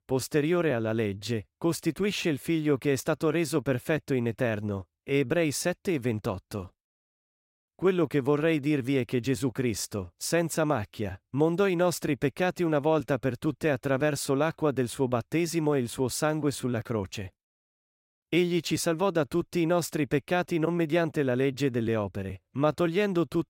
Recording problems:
none

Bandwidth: 16 kHz